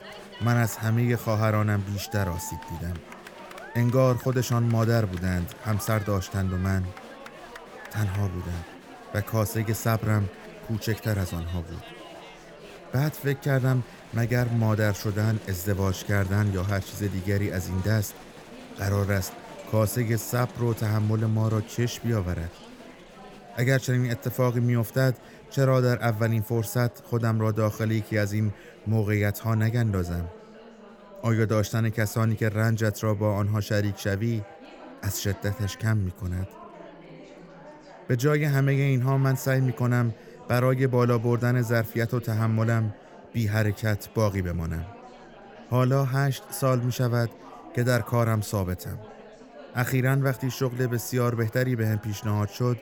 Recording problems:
chatter from many people; noticeable; throughout; 20 dB below the speech

